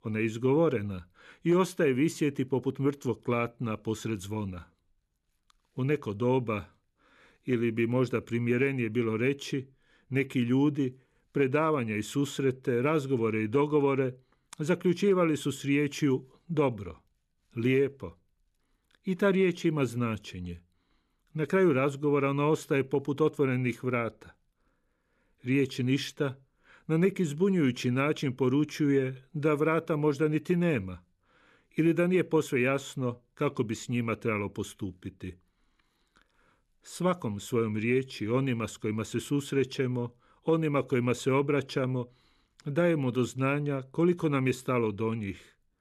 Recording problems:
none

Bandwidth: 13.5 kHz